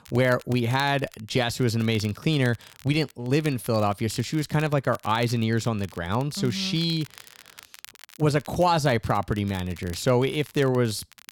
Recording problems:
crackle, like an old record; faint; 20 dB below the speech

